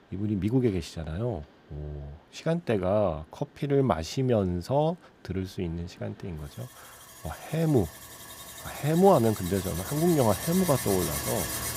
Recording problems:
machinery noise; loud; throughout; 8 dB below the speech

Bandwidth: 15.5 kHz